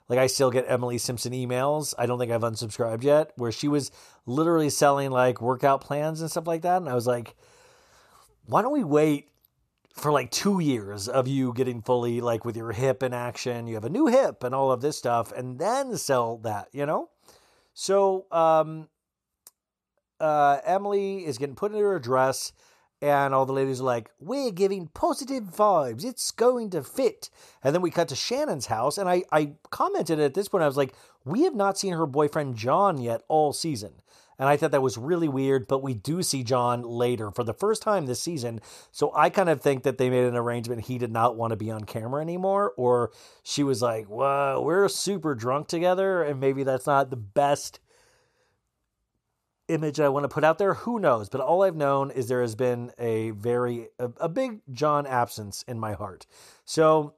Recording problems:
none

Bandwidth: 14 kHz